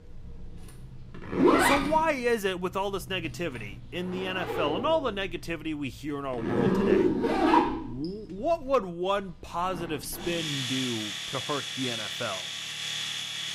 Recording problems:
household noises; very loud; throughout; 3 dB above the speech

